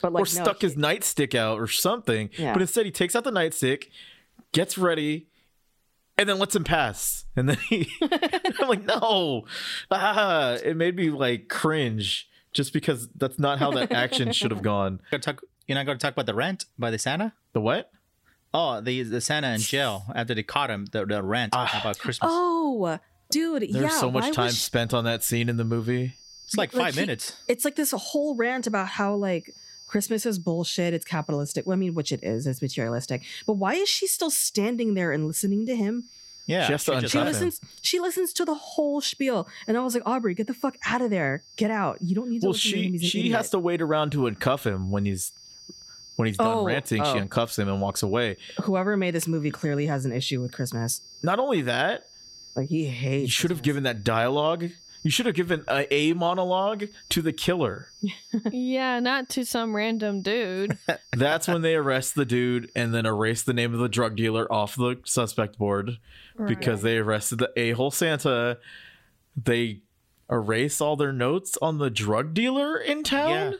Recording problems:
squashed, flat; somewhat
high-pitched whine; faint; from 24 s to 1:03; 4.5 kHz, 25 dB below the speech

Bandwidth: 16 kHz